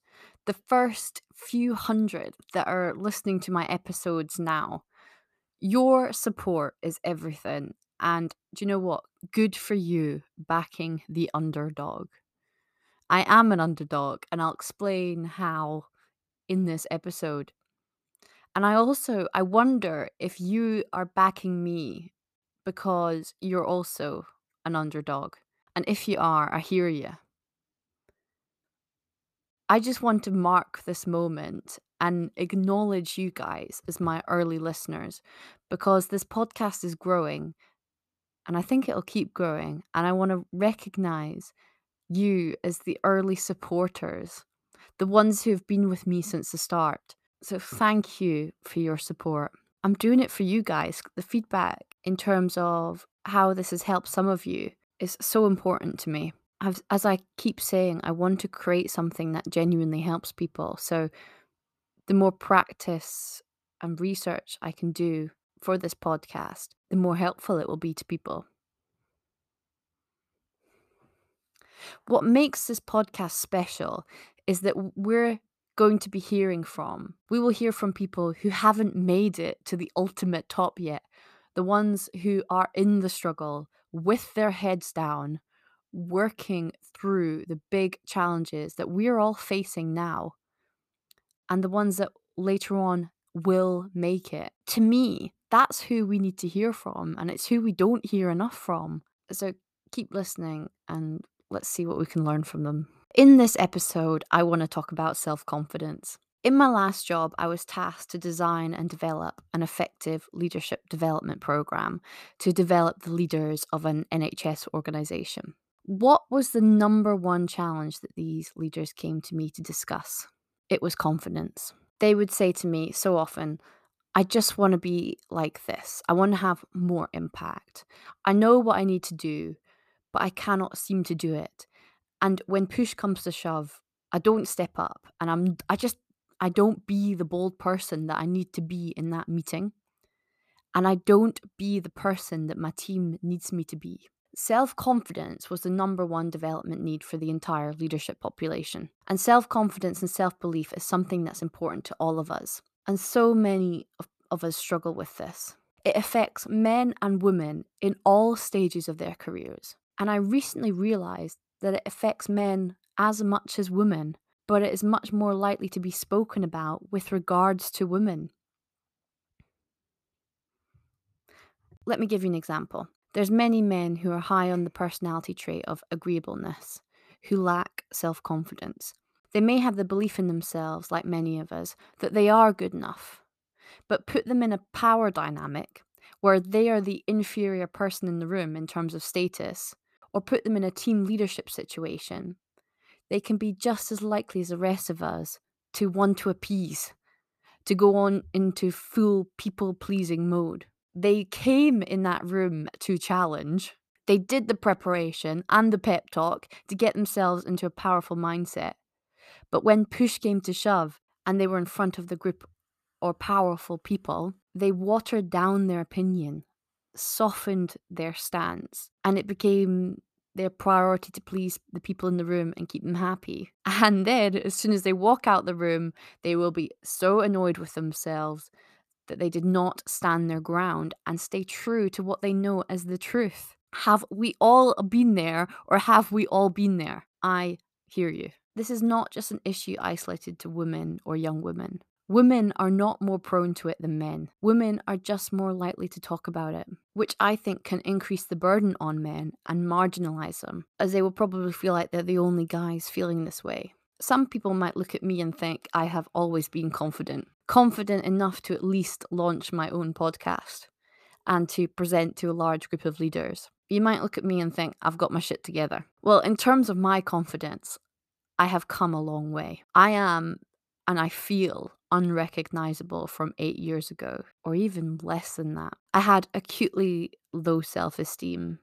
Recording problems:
none

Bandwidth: 14.5 kHz